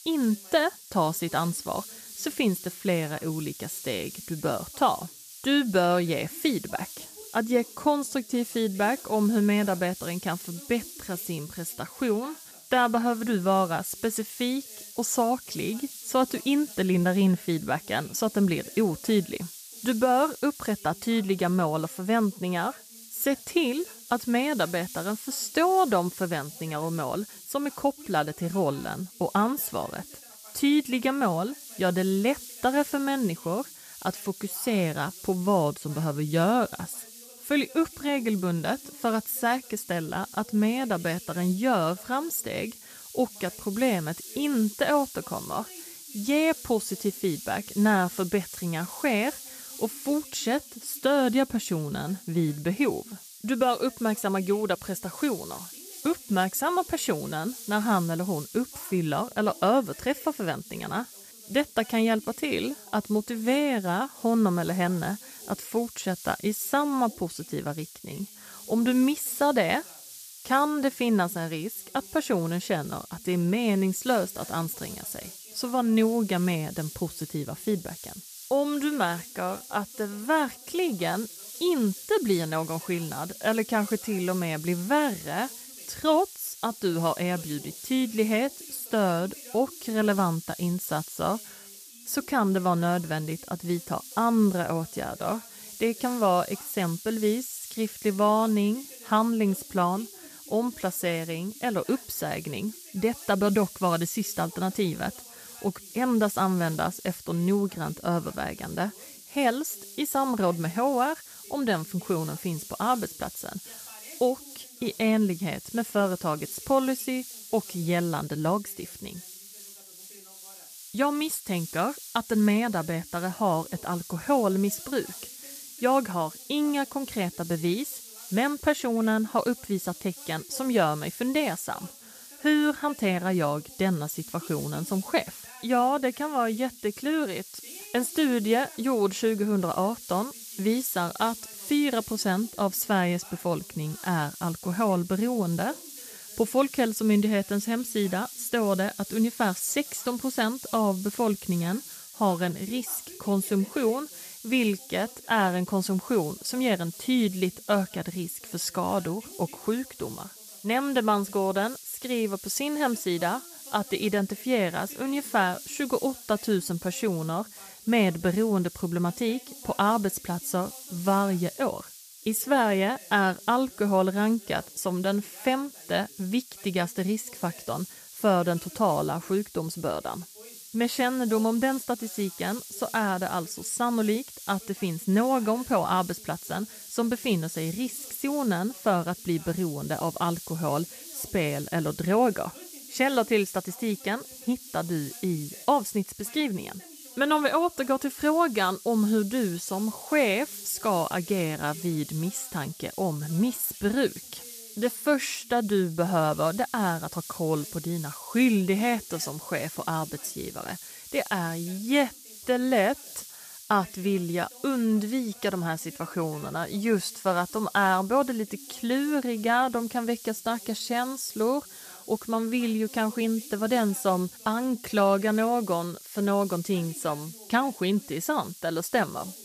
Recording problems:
hiss; noticeable; throughout; 15 dB below the speech
voice in the background; faint; throughout; 25 dB below the speech

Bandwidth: 14.5 kHz